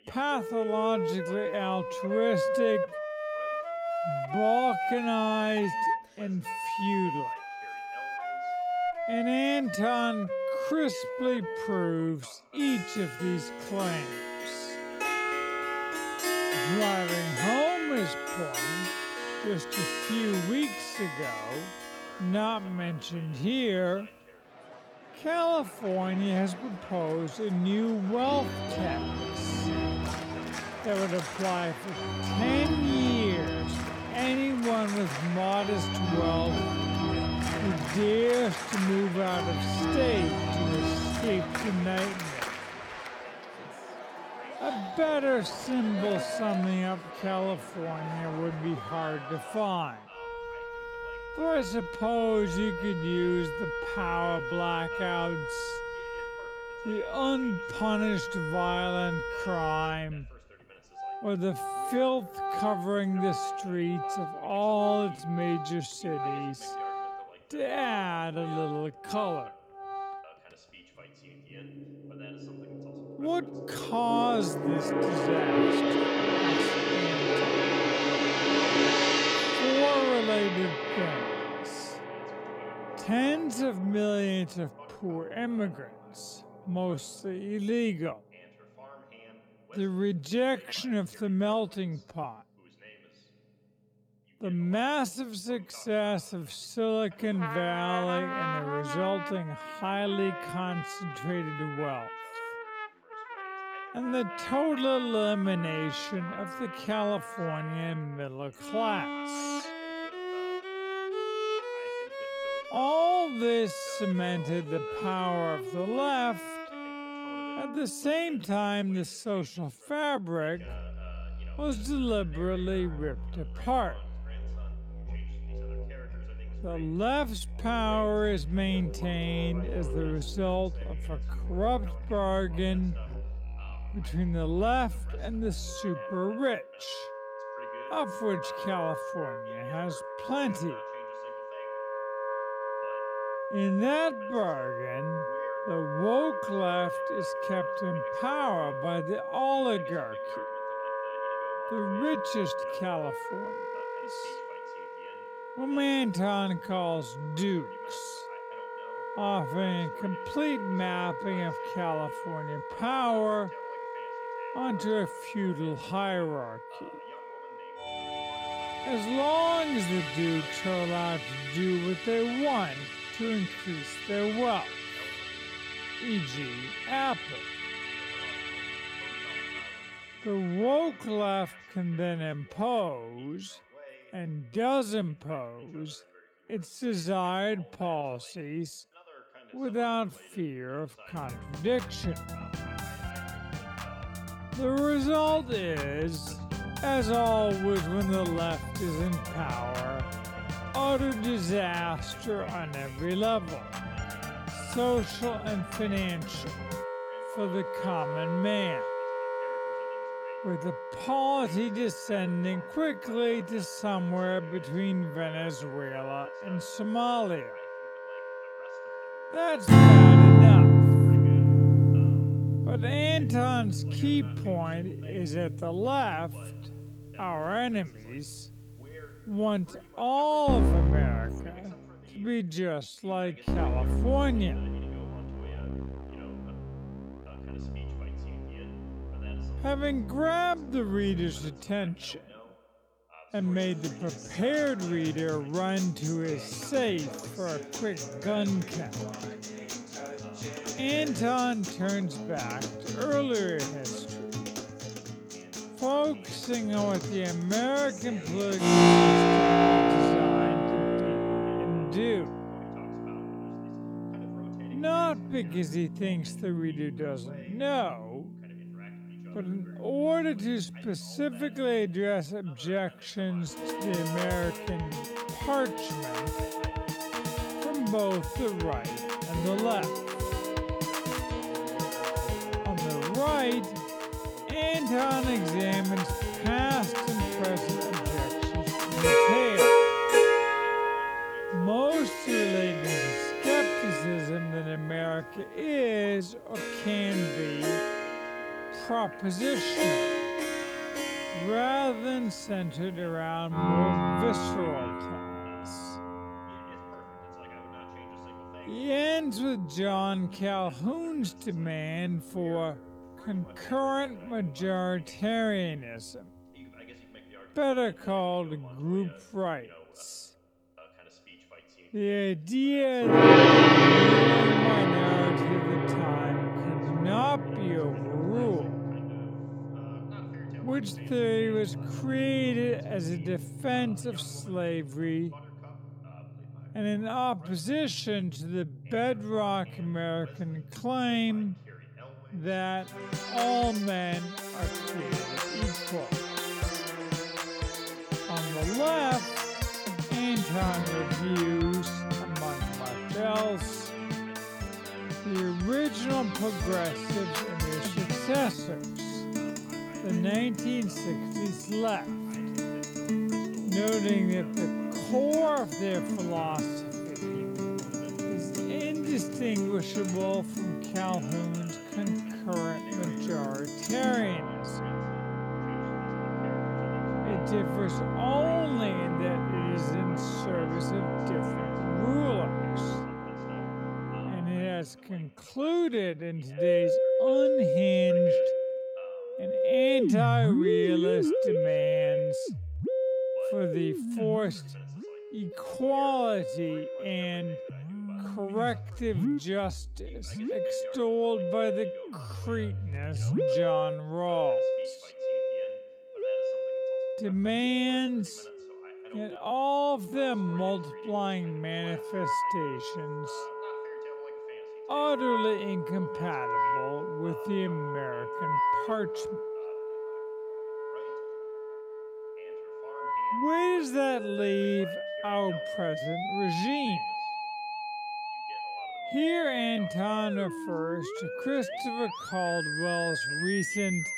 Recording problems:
wrong speed, natural pitch; too slow; 0.5 times normal speed
background music; very loud; throughout; 1 dB above the speech
voice in the background; faint; throughout; 25 dB below the speech

